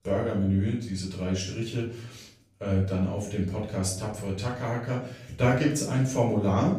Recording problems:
off-mic speech; far
room echo; noticeable; dies away in 0.5 s

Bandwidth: 15 kHz